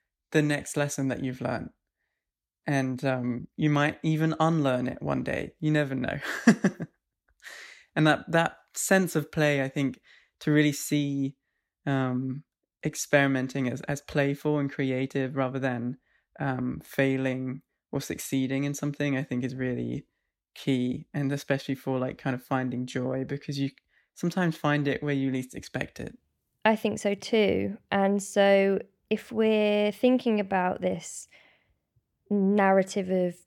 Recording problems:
uneven, jittery; strongly; from 2.5 to 31 s

